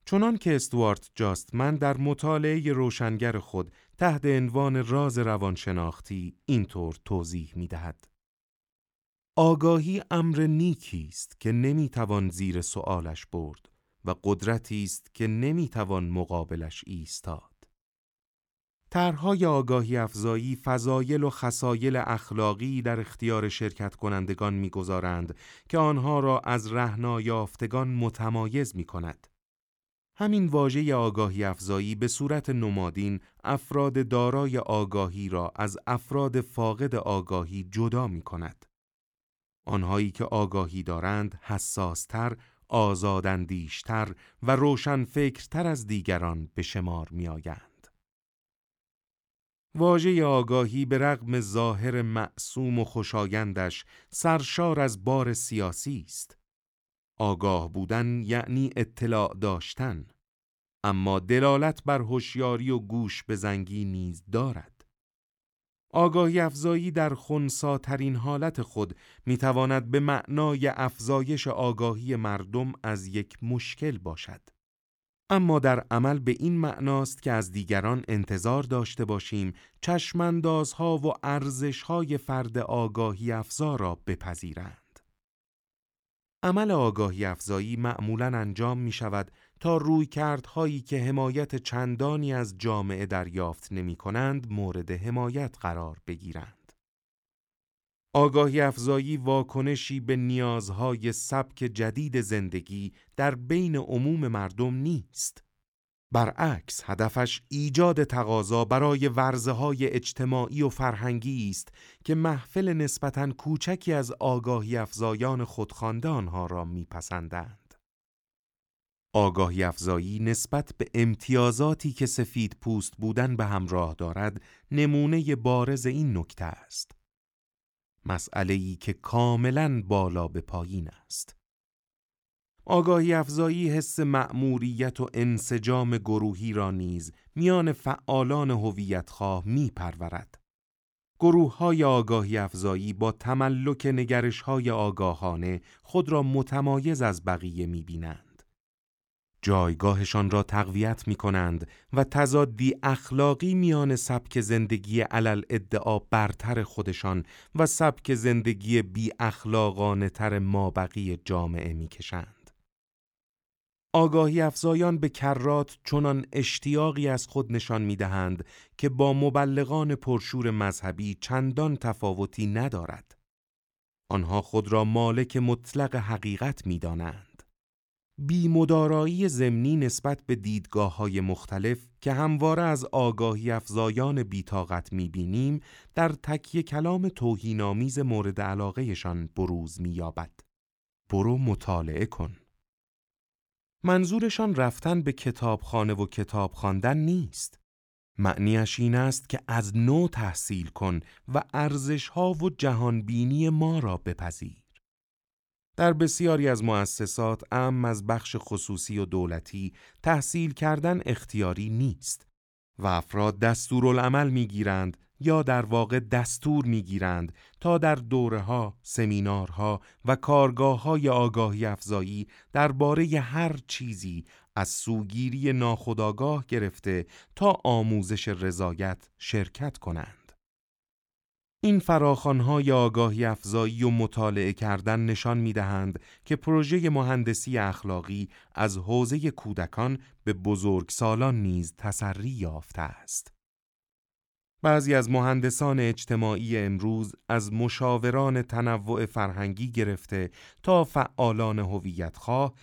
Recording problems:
none

